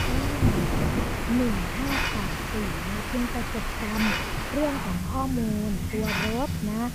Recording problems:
muffled; very slightly; fading above 3.5 kHz
rain or running water; very loud; throughout; as loud as the speech
hiss; loud; throughout; 3 dB below the speech
chatter from many people; faint; throughout; 30 dB below the speech
animal sounds; very faint; throughout; 30 dB below the speech

